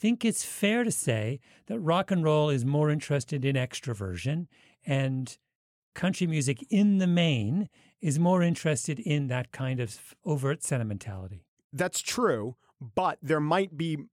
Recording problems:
none

